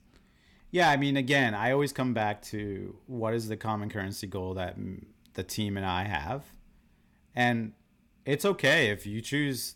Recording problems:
none

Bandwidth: 17.5 kHz